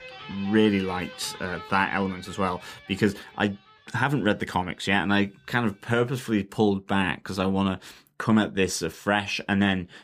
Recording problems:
background music; noticeable; throughout; 15 dB below the speech

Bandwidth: 15 kHz